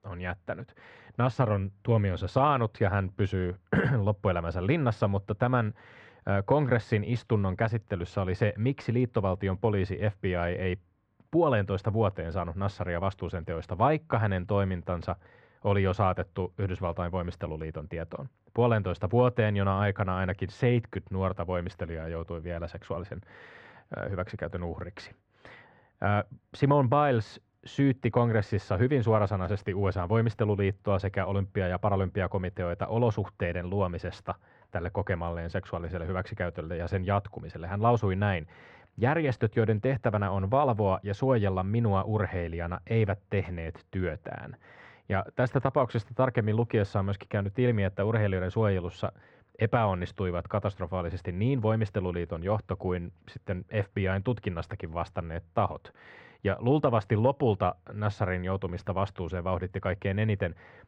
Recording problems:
muffled; very; fading above 1.5 kHz

